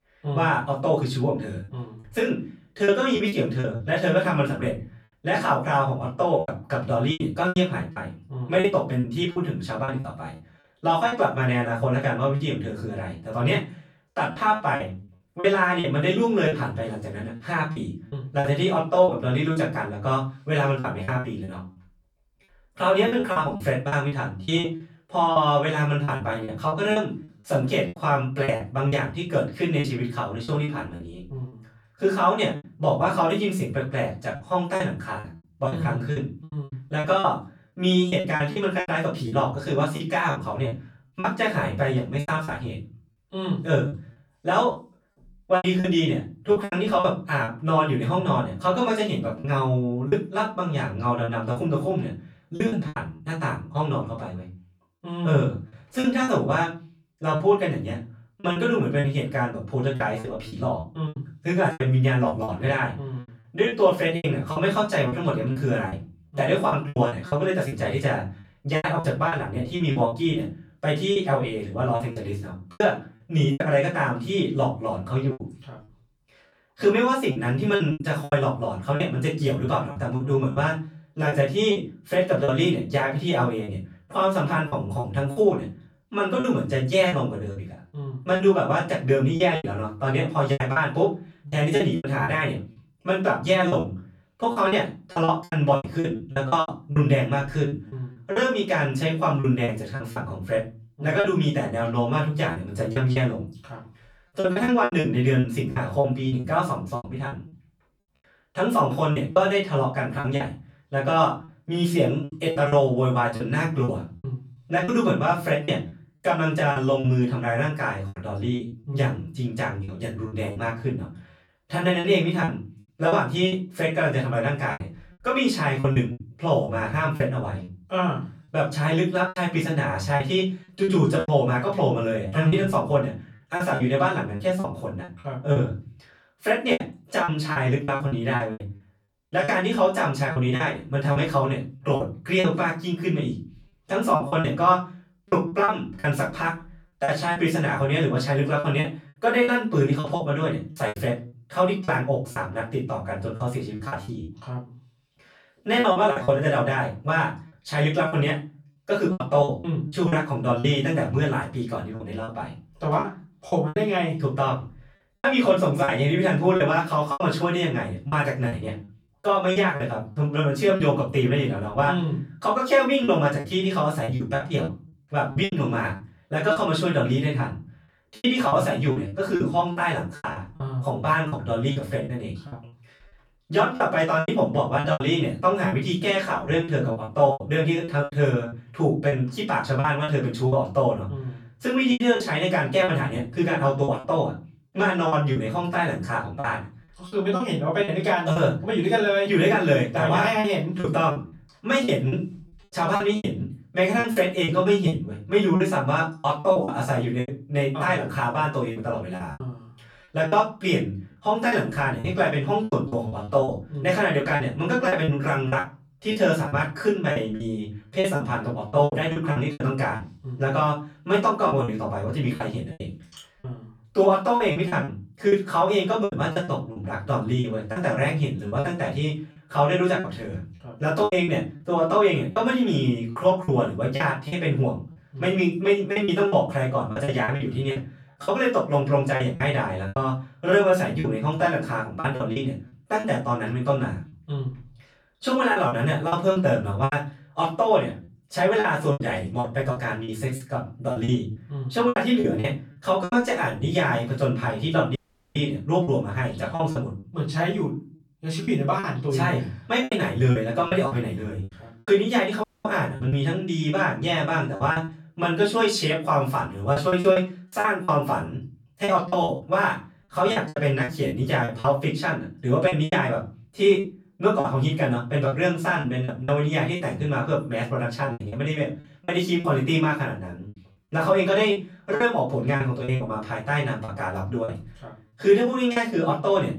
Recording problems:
off-mic speech; far
room echo; slight; dies away in 0.3 s
choppy; very; 10% of the speech affected
audio cutting out; at 4:15 and at 4:22

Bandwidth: 18.5 kHz